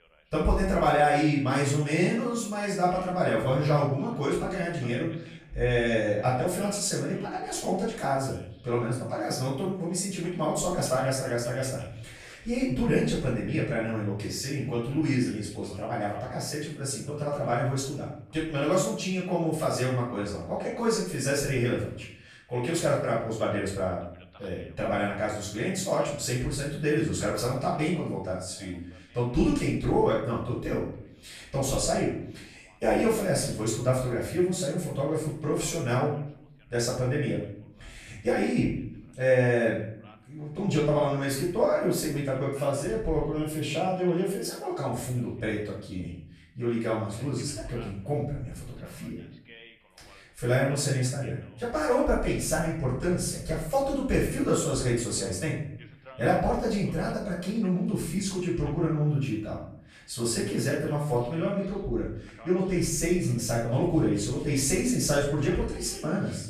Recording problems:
off-mic speech; far
room echo; noticeable; dies away in 0.6 s
voice in the background; faint; throughout; 25 dB below the speech

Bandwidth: 14 kHz